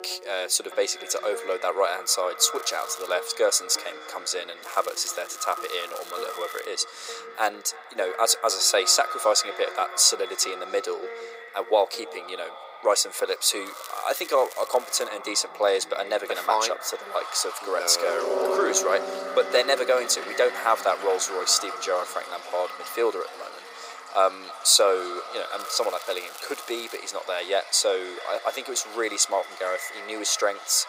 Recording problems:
thin; very; fading below 400 Hz
echo of what is said; noticeable; throughout; 300 ms later, 15 dB below the speech
background music; noticeable; throughout; 15 dB below the speech
rain or running water; noticeable; throughout; 20 dB below the speech
crackling; noticeable; 4 times, first at 2.5 s; 20 dB below the speech

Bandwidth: 15.5 kHz